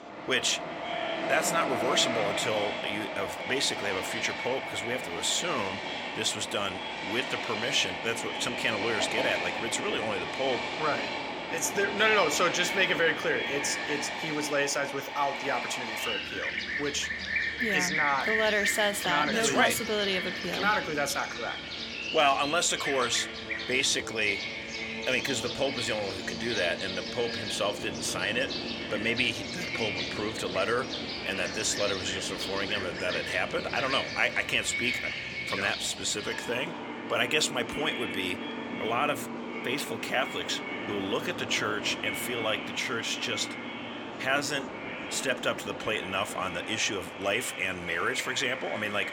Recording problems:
echo of what is said; strong; throughout; 170 ms later, 10 dB below the speech
thin; somewhat; fading below 650 Hz
train or aircraft noise; loud; throughout; 5 dB below the speech
background chatter; faint; throughout; 3 voices, 30 dB below the speech

